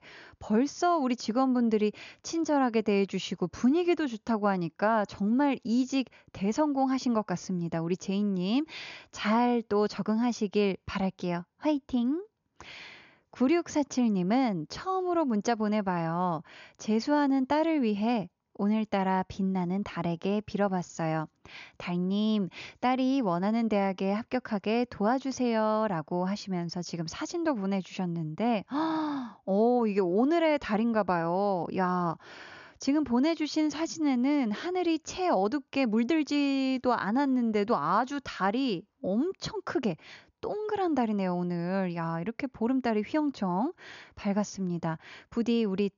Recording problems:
high frequencies cut off; noticeable; nothing above 7 kHz

